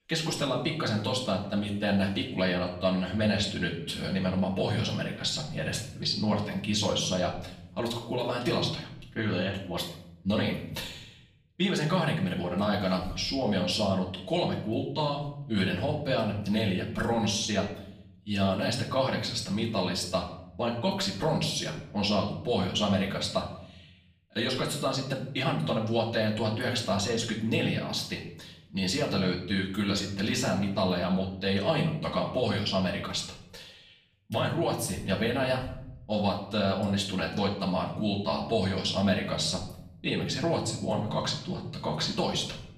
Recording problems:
off-mic speech; far
room echo; slight; dies away in 0.7 s

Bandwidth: 15 kHz